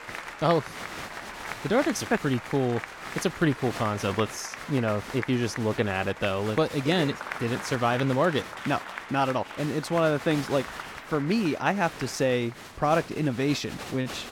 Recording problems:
crowd noise; noticeable; throughout; 10 dB below the speech

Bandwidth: 17 kHz